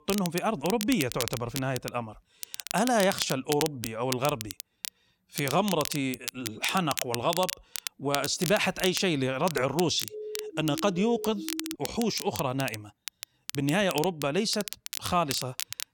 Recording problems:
crackle, like an old record; loud; 8 dB below the speech
siren; noticeable; from 10 to 12 s; peak 9 dB below the speech

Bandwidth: 17.5 kHz